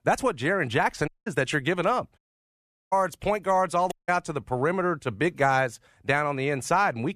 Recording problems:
audio cutting out; at 1 s, at 2 s for 0.5 s and at 4 s

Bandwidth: 14.5 kHz